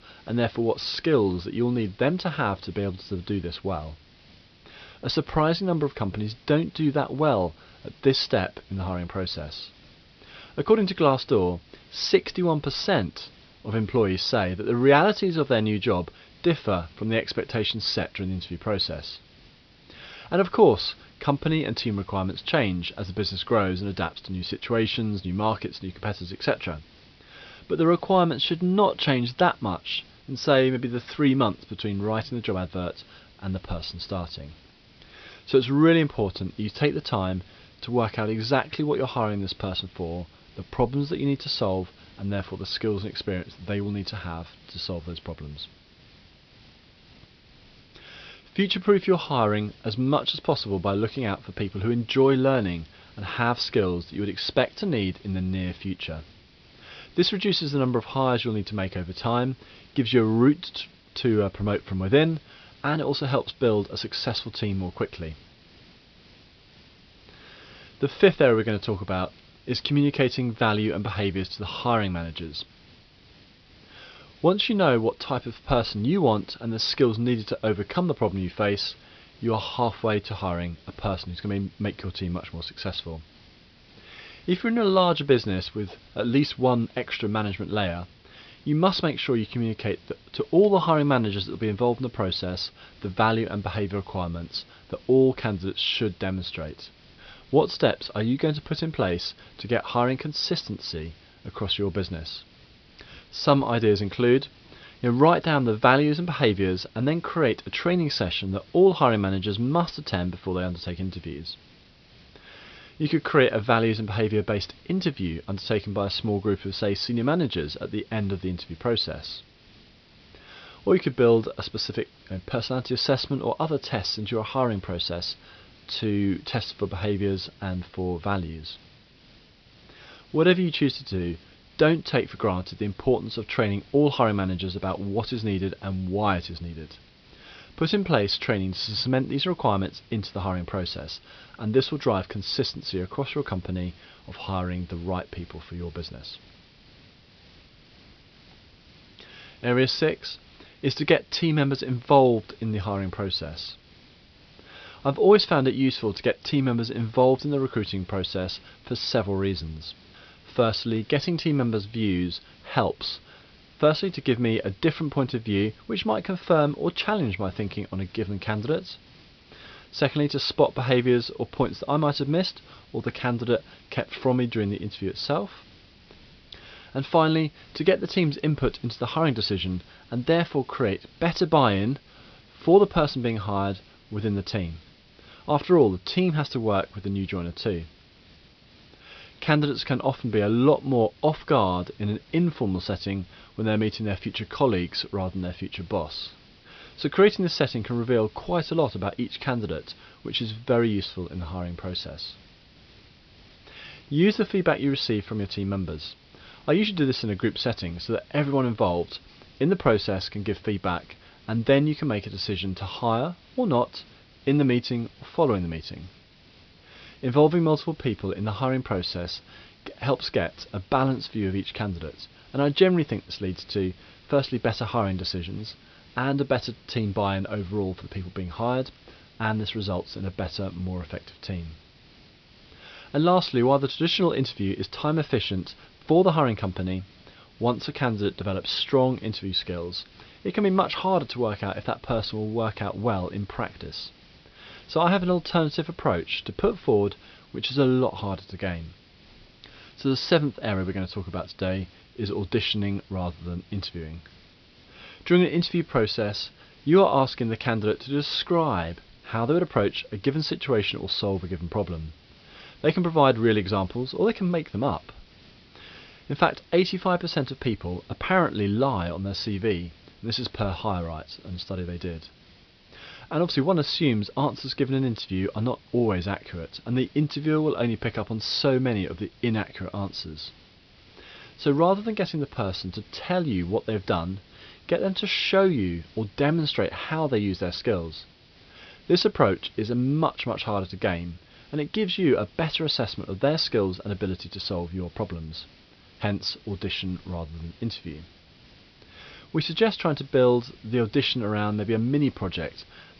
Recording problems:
high frequencies cut off; noticeable; nothing above 5.5 kHz
hiss; faint; throughout; 25 dB below the speech

